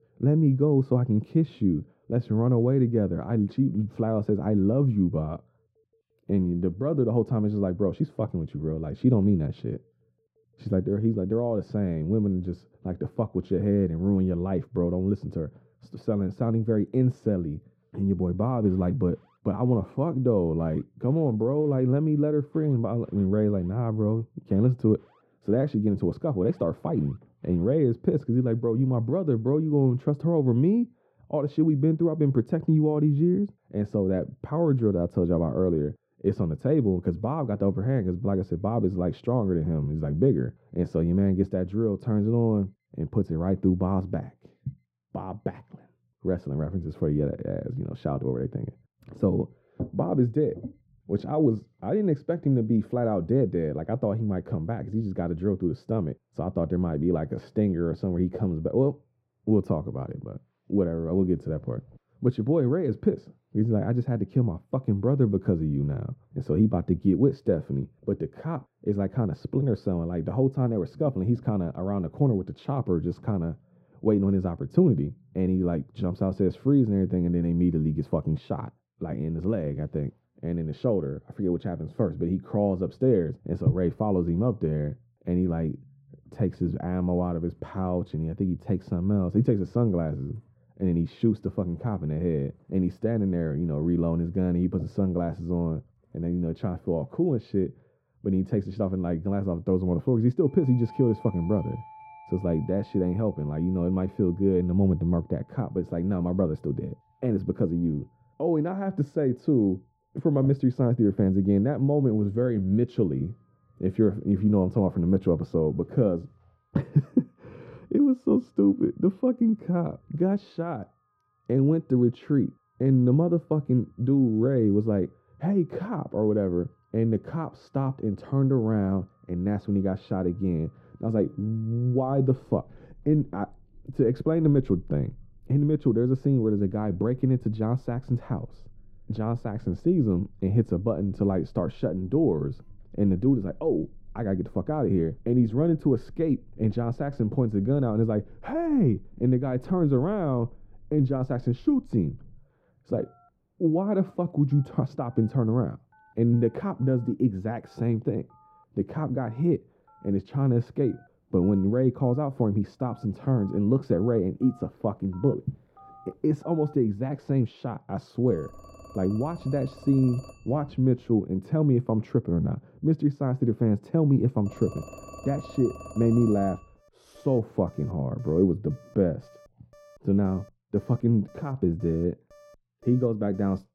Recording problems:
muffled; very; fading above 1.5 kHz
alarms or sirens; faint; throughout; 25 dB below the speech

